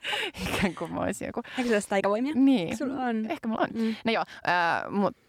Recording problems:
uneven, jittery; strongly; from 0.5 to 4.5 s

